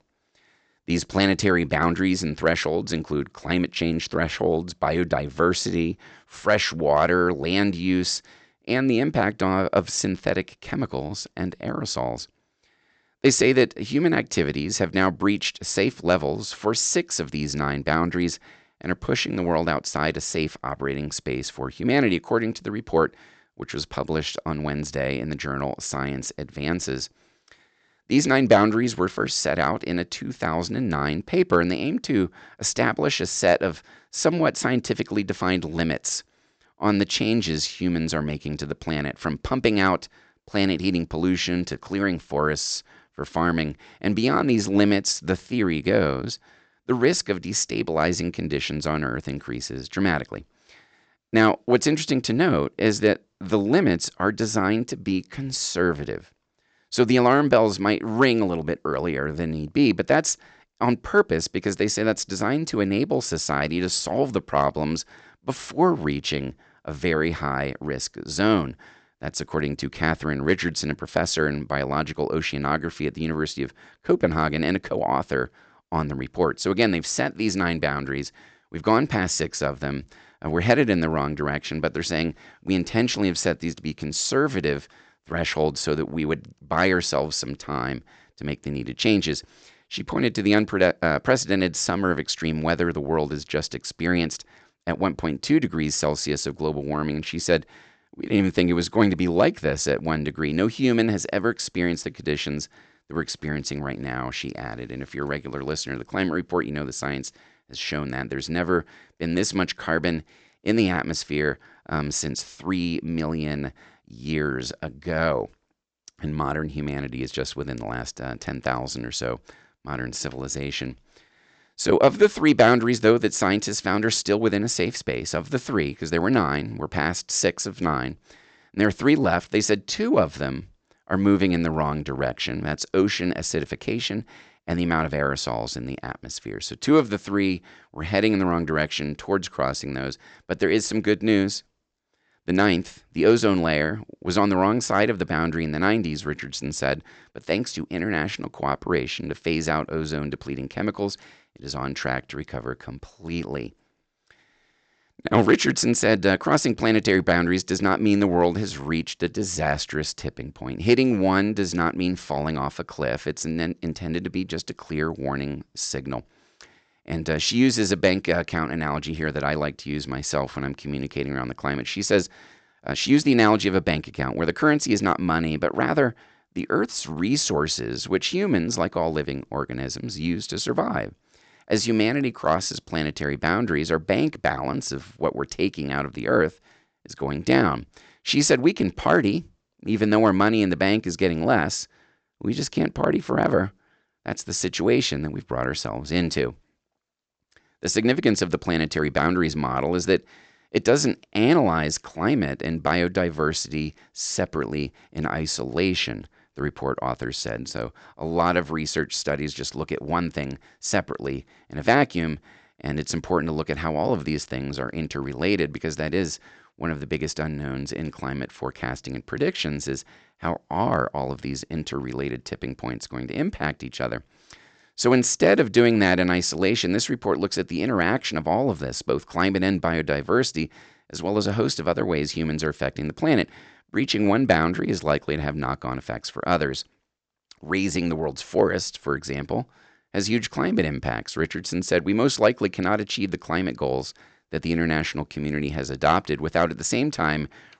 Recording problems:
high frequencies cut off; noticeable; nothing above 8 kHz

